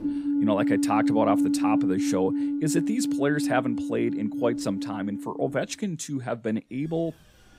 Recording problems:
alarms or sirens; very loud; throughout; 2 dB above the speech

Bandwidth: 15.5 kHz